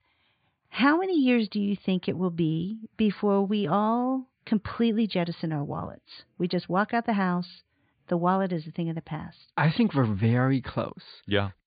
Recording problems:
high frequencies cut off; severe; nothing above 4.5 kHz

